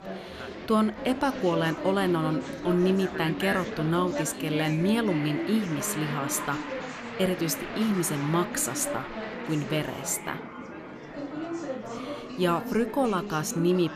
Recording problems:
murmuring crowd; loud; throughout; 7 dB below the speech

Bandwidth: 14.5 kHz